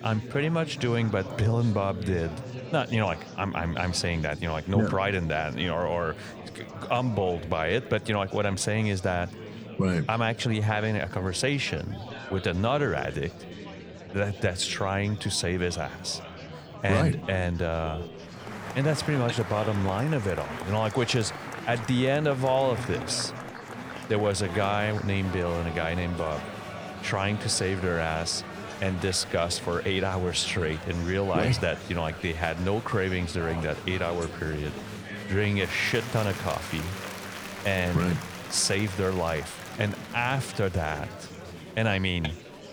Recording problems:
murmuring crowd; noticeable; throughout; 10 dB below the speech

